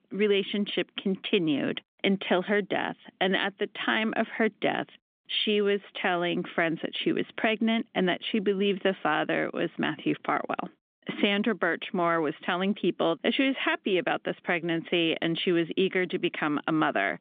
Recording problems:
phone-call audio; nothing above 3 kHz

